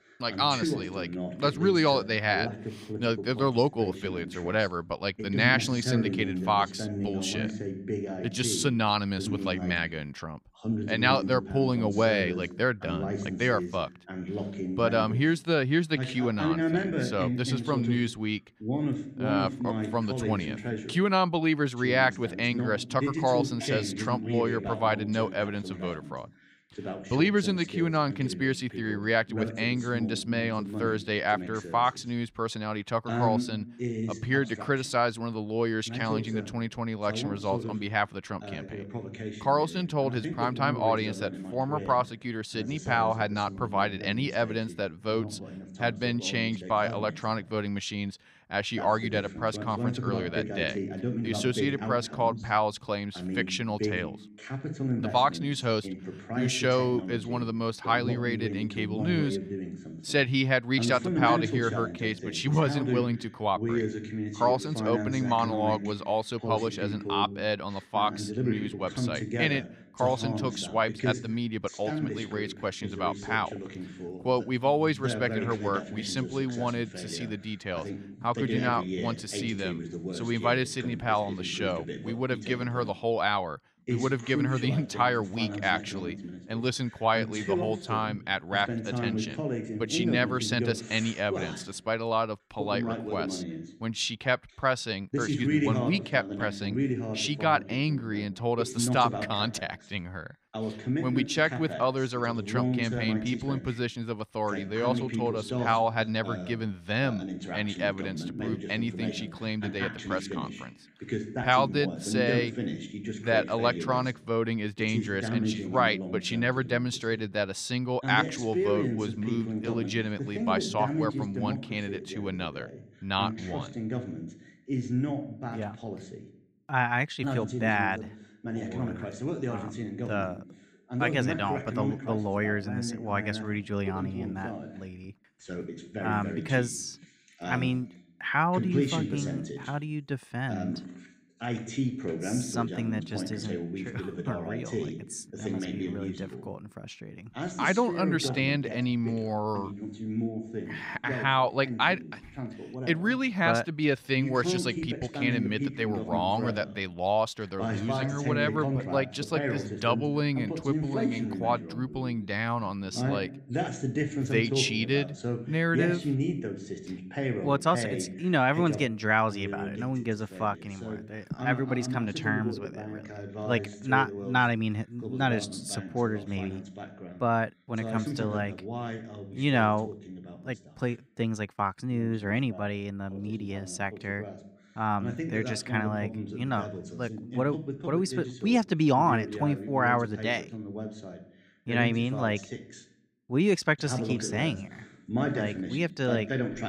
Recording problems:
voice in the background; loud; throughout; 6 dB below the speech

